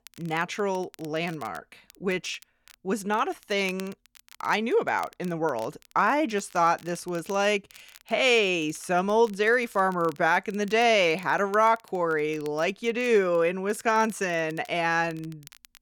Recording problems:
crackle, like an old record; faint; 25 dB below the speech

